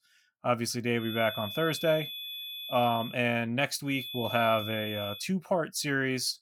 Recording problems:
high-pitched whine; loud; from 1 to 3 s and from 4 to 5 s; 3.5 kHz, 8 dB below the speech

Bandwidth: 17.5 kHz